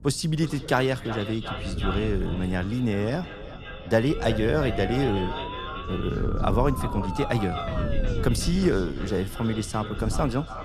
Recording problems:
echo of what is said; strong; throughout; 360 ms later, 10 dB below the speech
voice in the background; noticeable; throughout; 20 dB below the speech
wind noise on the microphone; occasional gusts; 15 dB below the speech
siren; noticeable; from 4 to 8.5 s; peak 9 dB below the speech

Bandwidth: 14 kHz